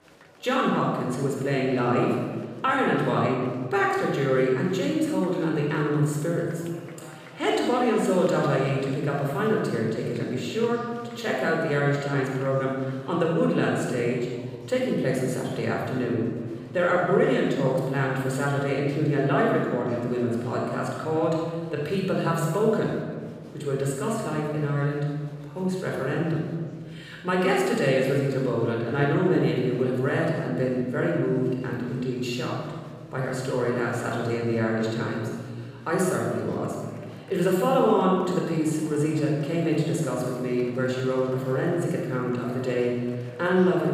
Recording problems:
room echo; strong; dies away in 1.5 s
off-mic speech; somewhat distant
murmuring crowd; faint; throughout; 25 dB below the speech

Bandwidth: 15 kHz